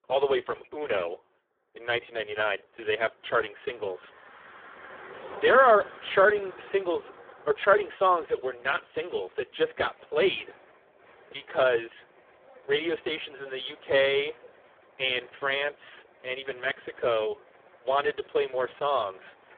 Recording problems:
phone-call audio; poor line; nothing above 3.5 kHz
traffic noise; faint; throughout; 25 dB below the speech

